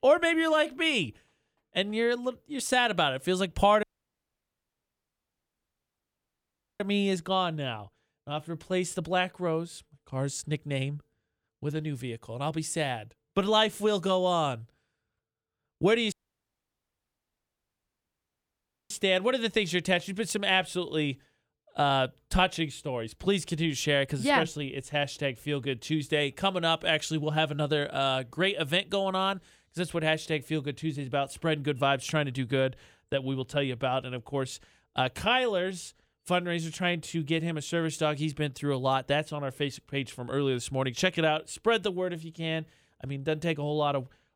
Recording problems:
audio cutting out; at 4 s for 3 s and at 16 s for 3 s

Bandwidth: 18.5 kHz